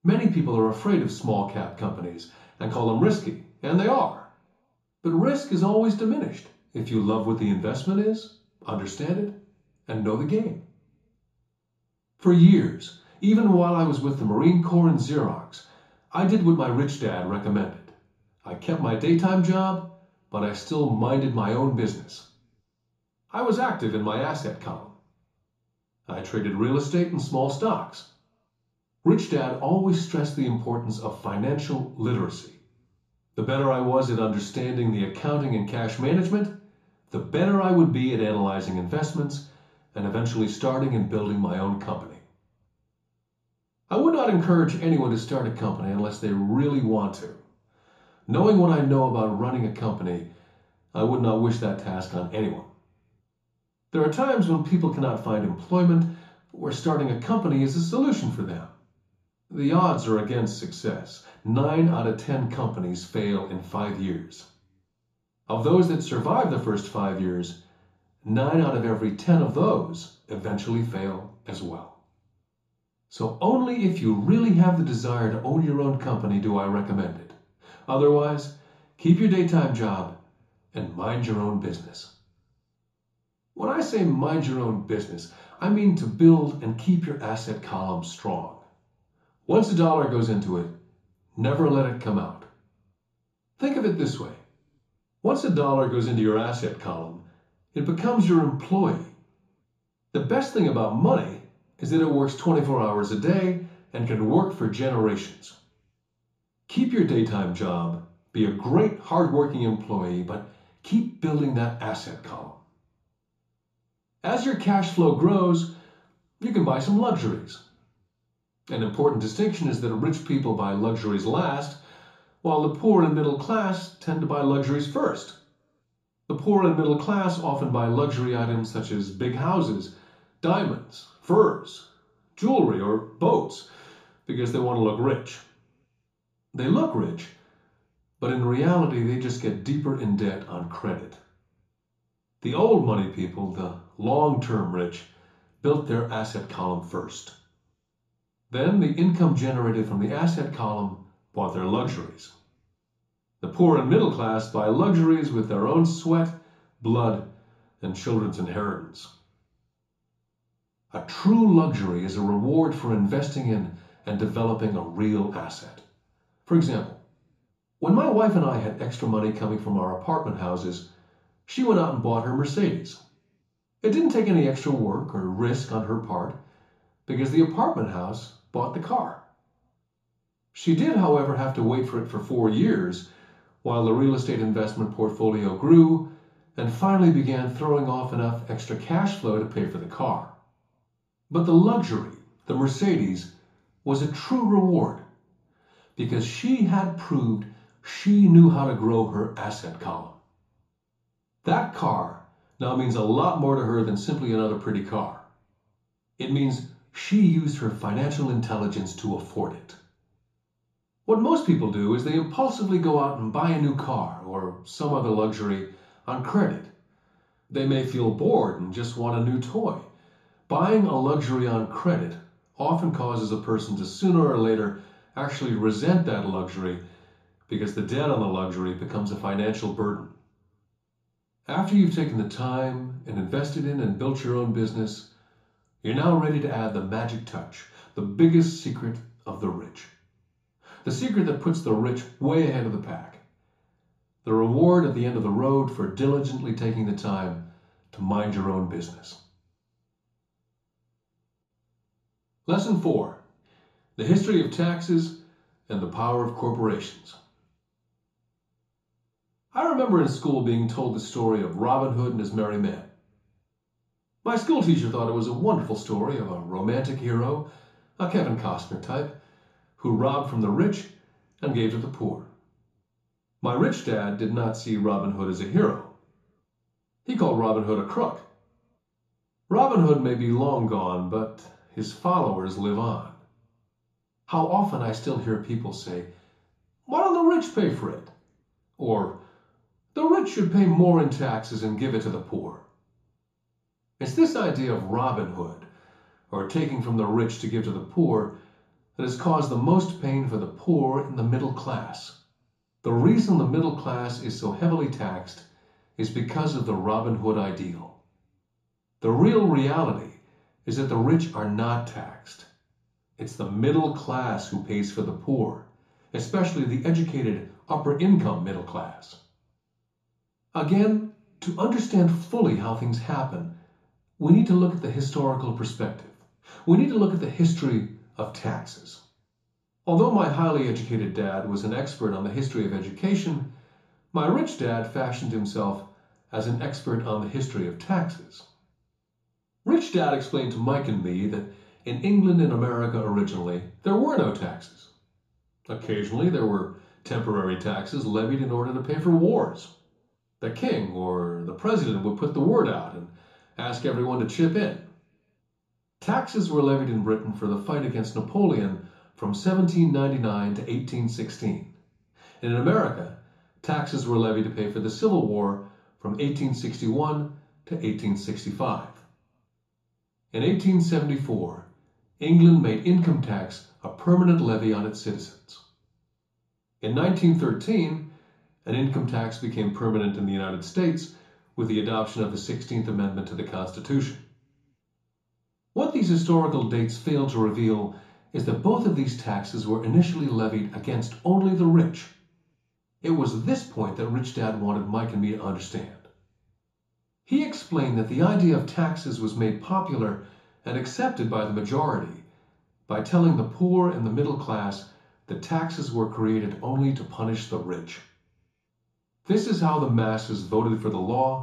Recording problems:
off-mic speech; far
room echo; slight; dies away in 0.6 s

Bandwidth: 14.5 kHz